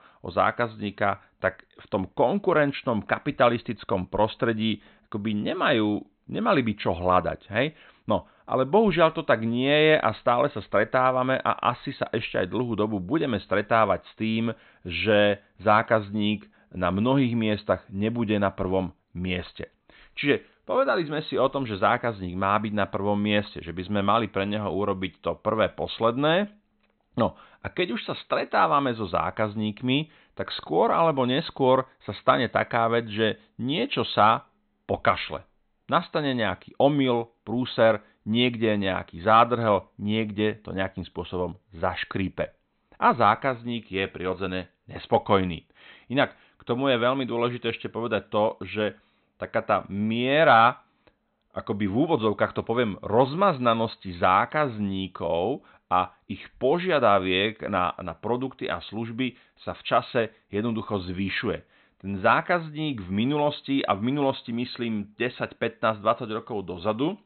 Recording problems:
high frequencies cut off; severe; nothing above 4 kHz

